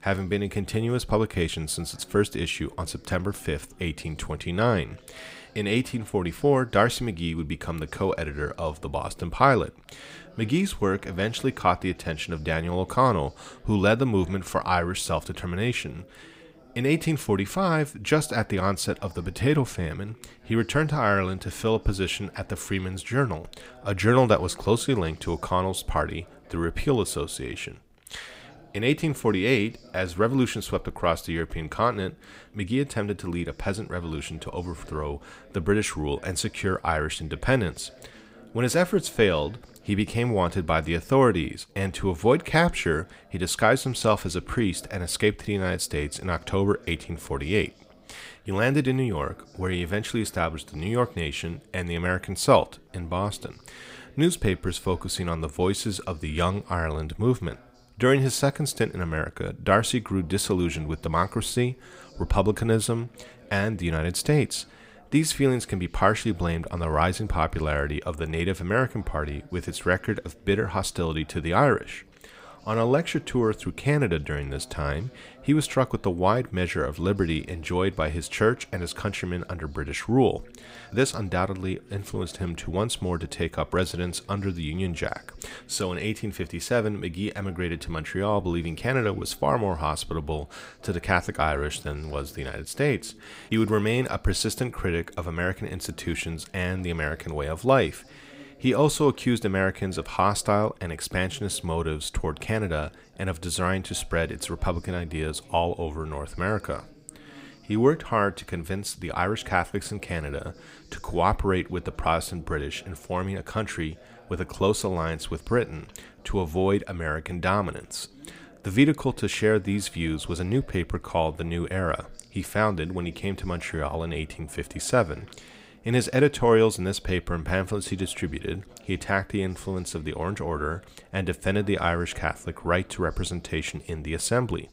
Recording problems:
background chatter; faint; throughout; 3 voices, 25 dB below the speech

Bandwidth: 15.5 kHz